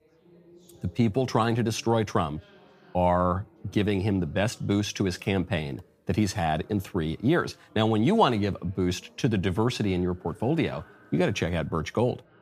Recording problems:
background chatter; faint; throughout; 4 voices, 30 dB below the speech

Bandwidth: 15 kHz